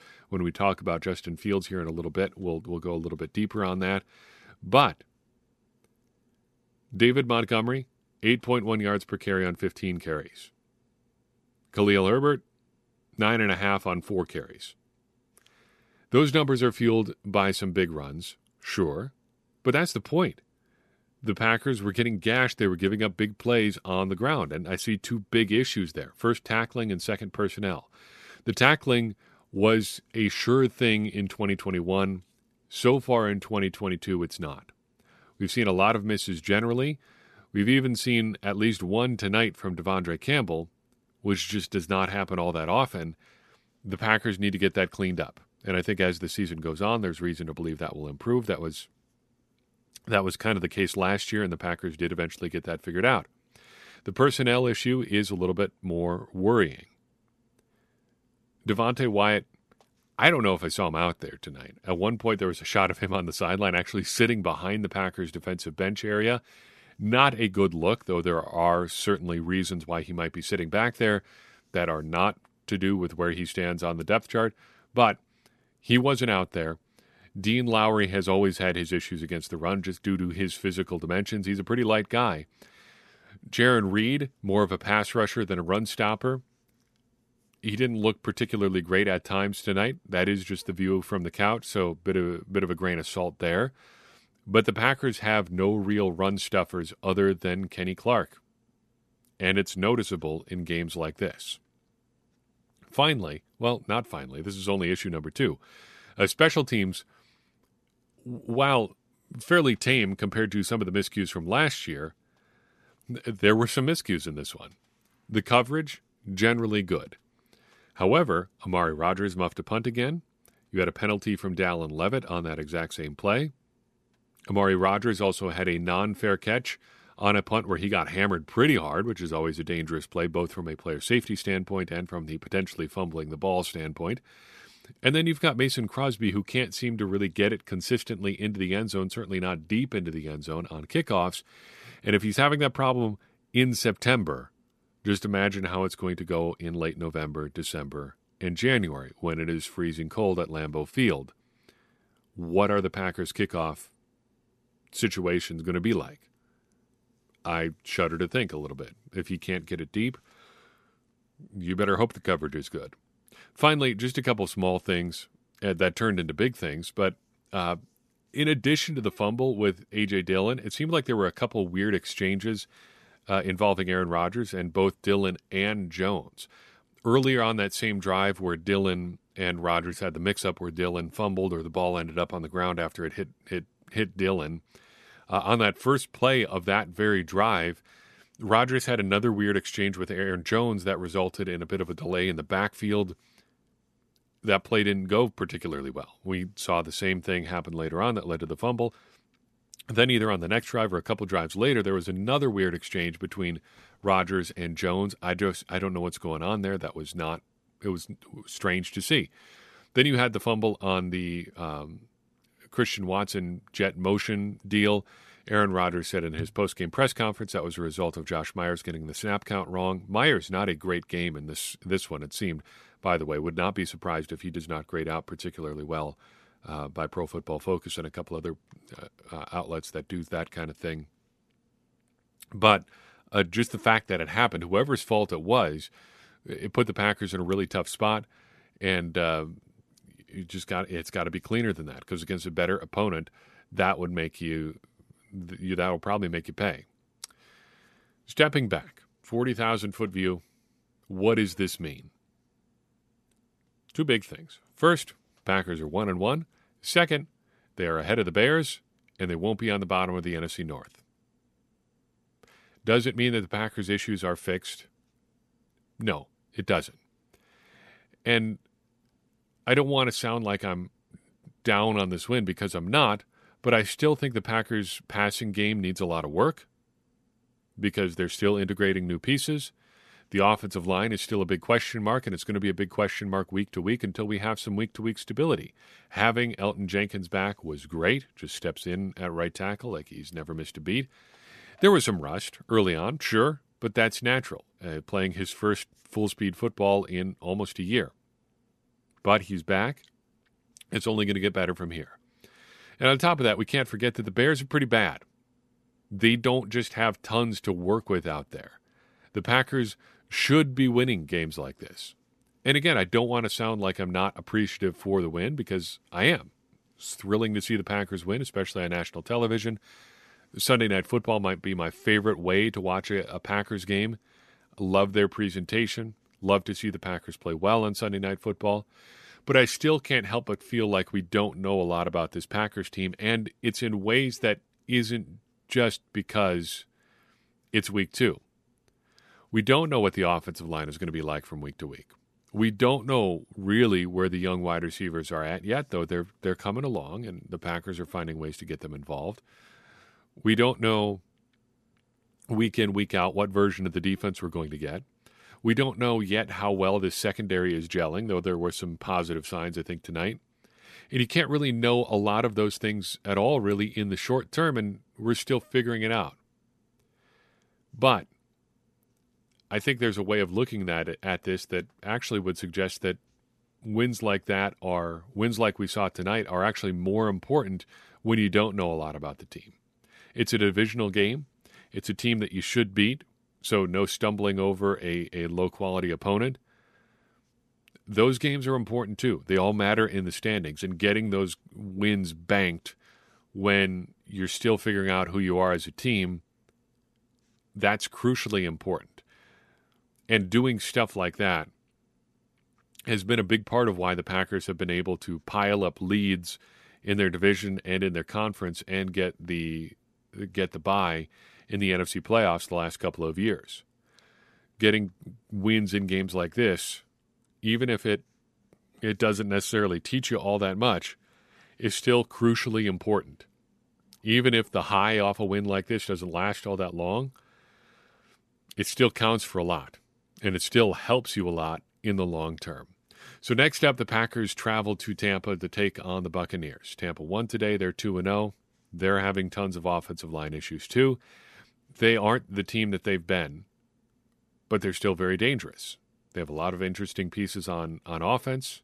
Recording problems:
none

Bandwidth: 13.5 kHz